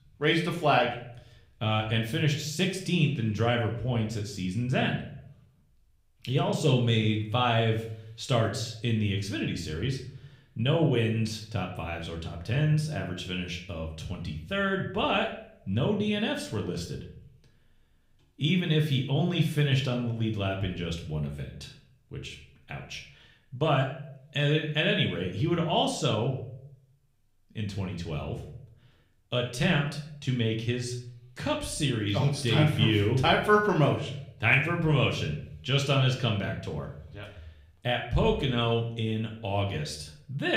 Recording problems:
room echo; slight; dies away in 0.5 s
off-mic speech; somewhat distant
abrupt cut into speech; at the end

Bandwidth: 15.5 kHz